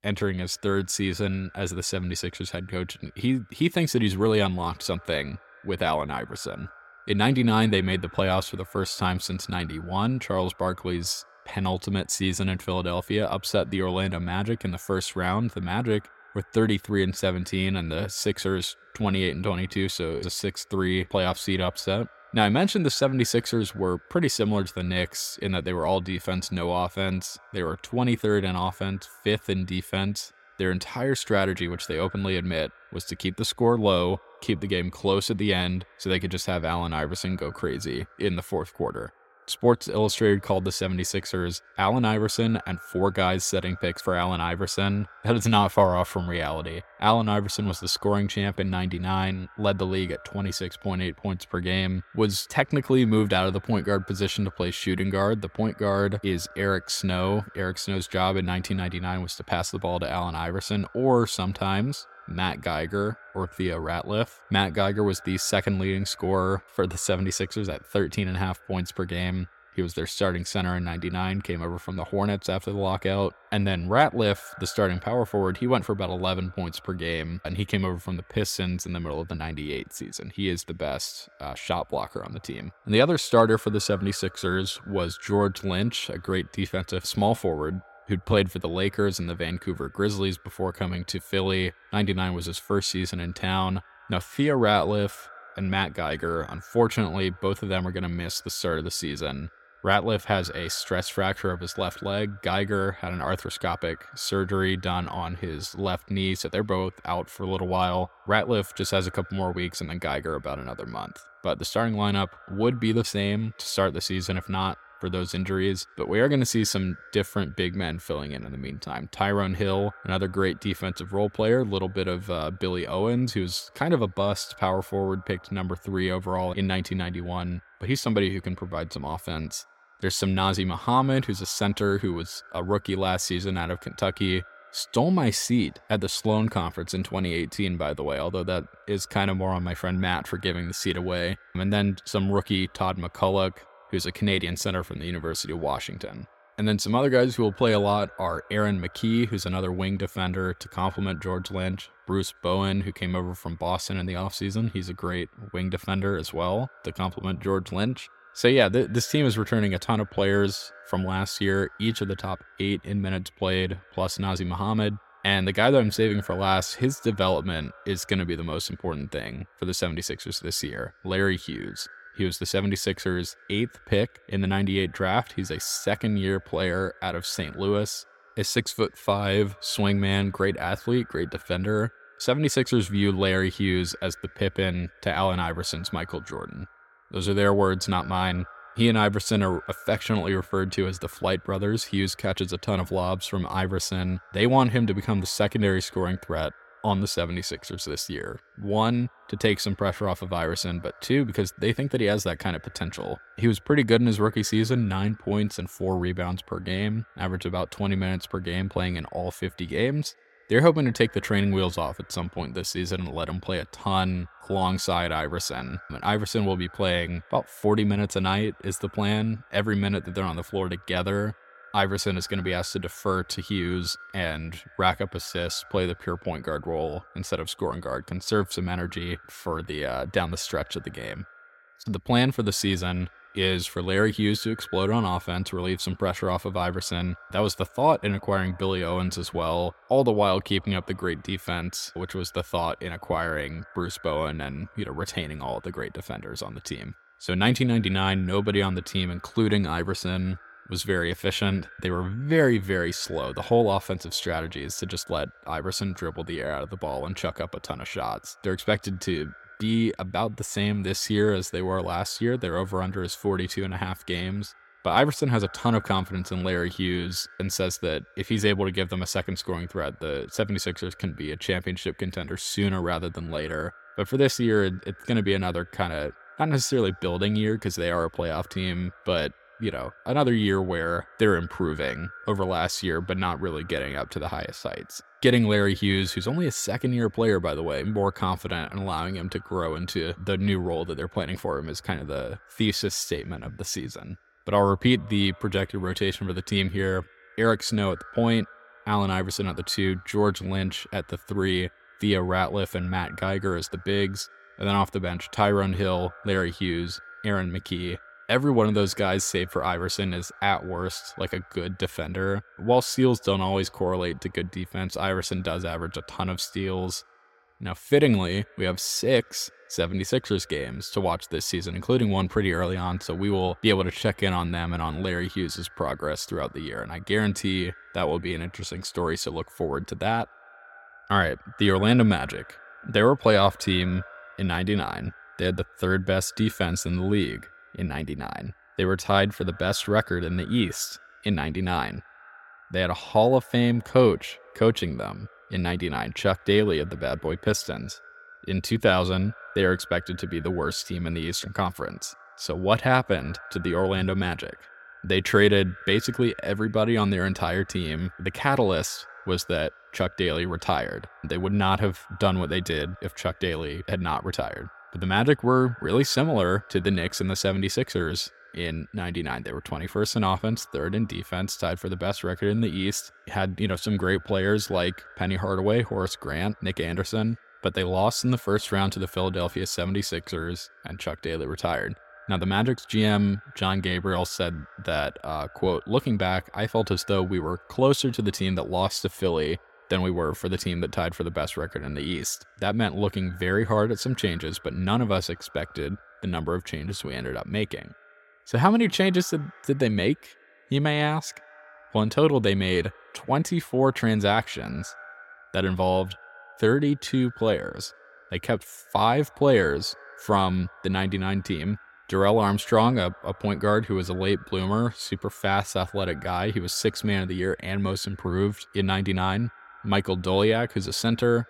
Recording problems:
echo of what is said; faint; throughout; 110 ms later, 25 dB below the speech

